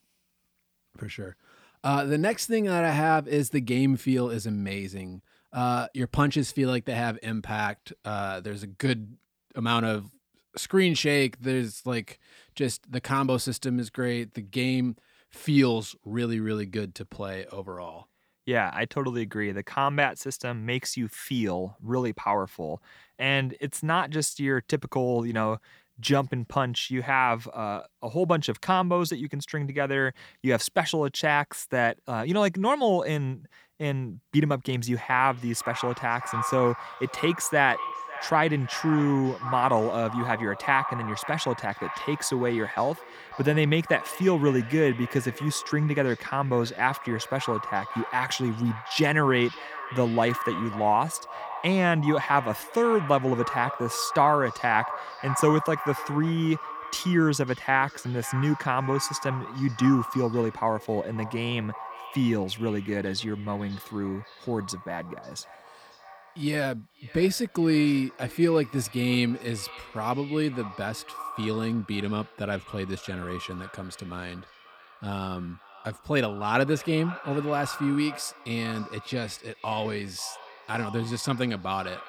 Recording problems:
echo of what is said; strong; from 35 s on; 550 ms later, 10 dB below the speech

